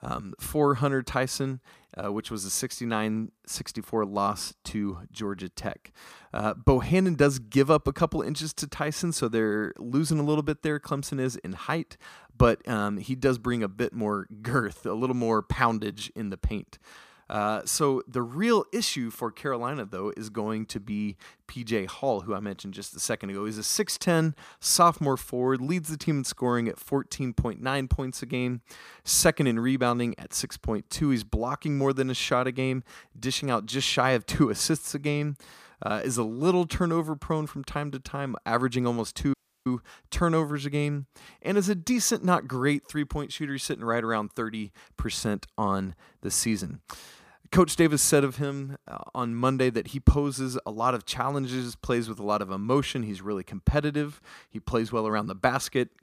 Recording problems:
audio cutting out; at 39 s

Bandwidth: 15 kHz